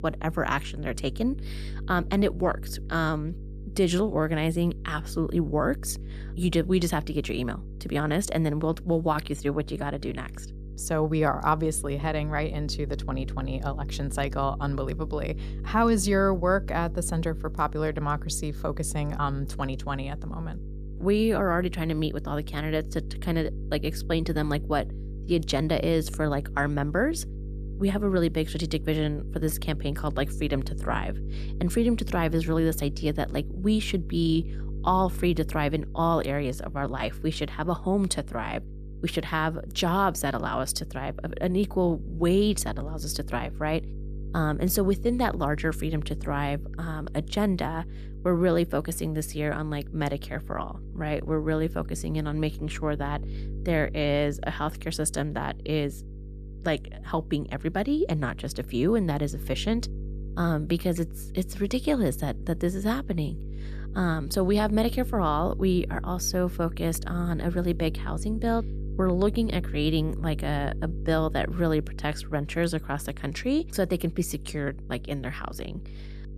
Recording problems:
electrical hum; noticeable; throughout; 50 Hz, 20 dB below the speech

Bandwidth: 14.5 kHz